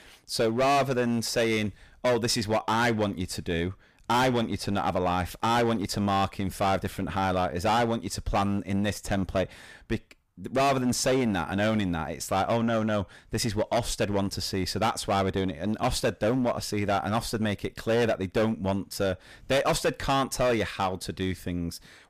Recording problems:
distortion; heavy; 11% of the sound clipped

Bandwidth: 15 kHz